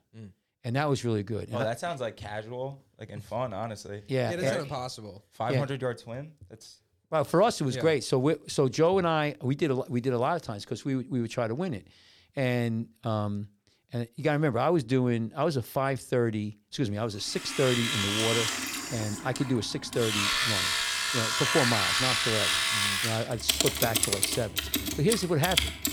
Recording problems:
household noises; very loud; from 18 s on; 3 dB above the speech

